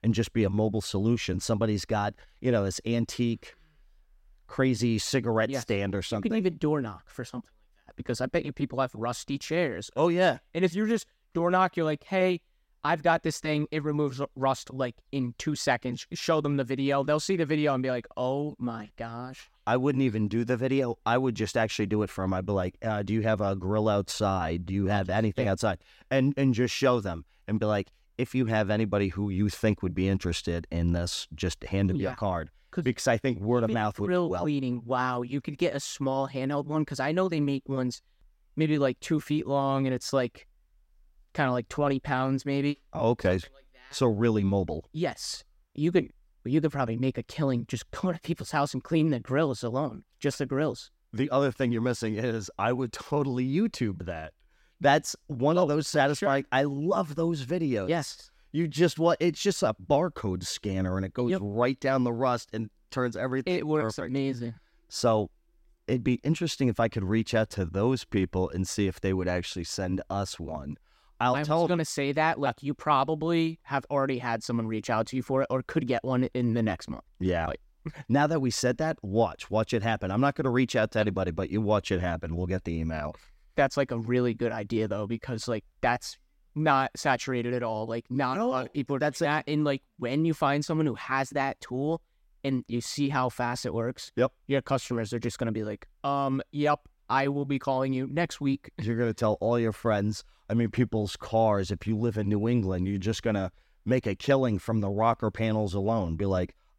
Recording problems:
none

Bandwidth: 16 kHz